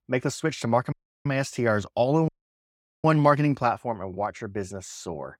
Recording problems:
audio cutting out; at 1 s and at 2.5 s for 1 s

